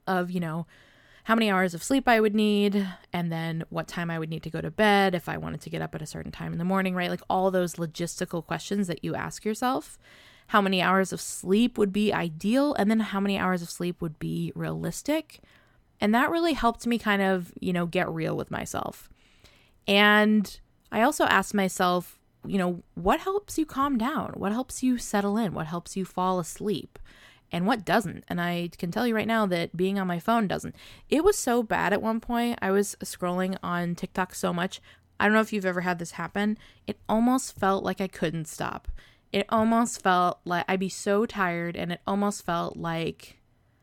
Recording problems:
none

